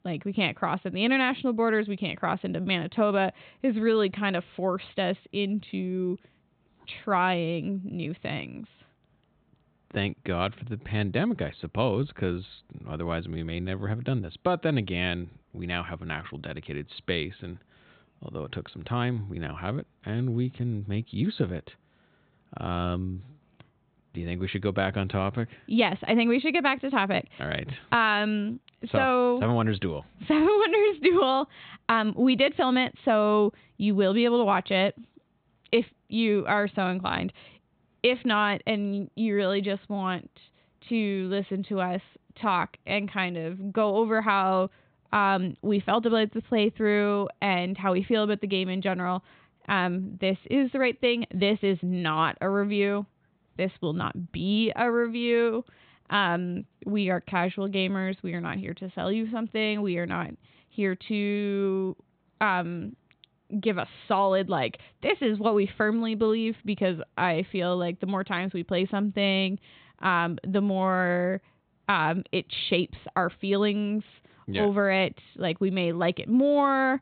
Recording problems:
high frequencies cut off; severe; nothing above 4 kHz

